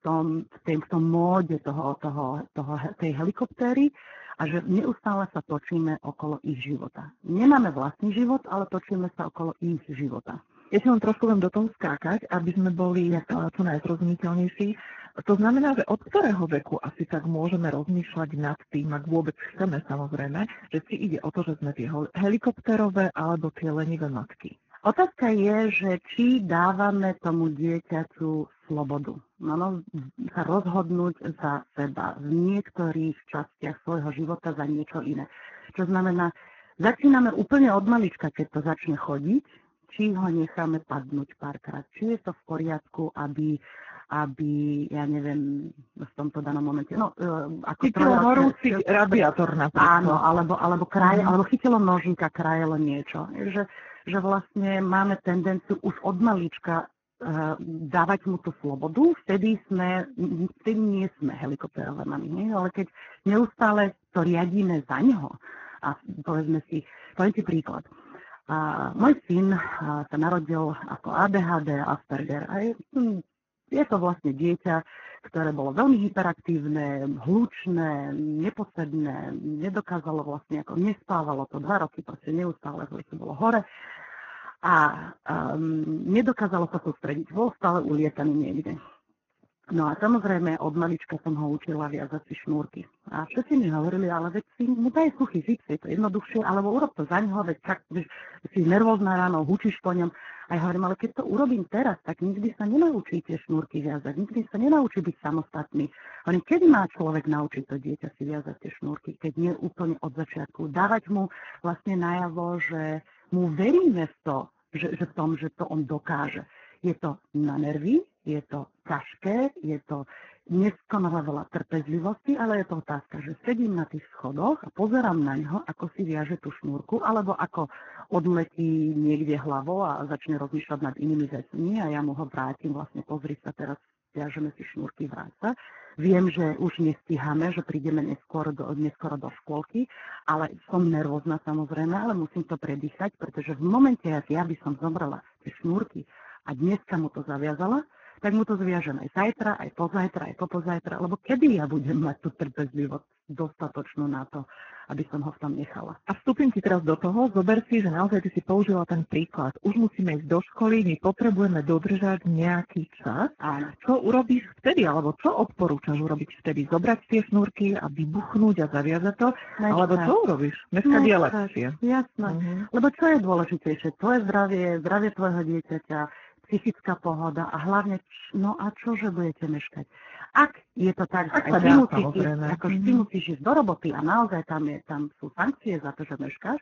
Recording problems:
garbled, watery; badly; nothing above 6.5 kHz

